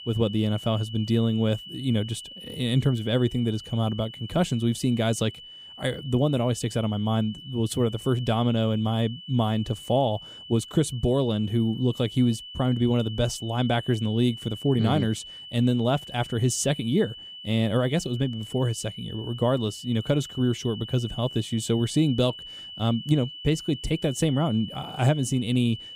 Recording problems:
high-pitched whine; noticeable; throughout; 3 kHz, 15 dB below the speech

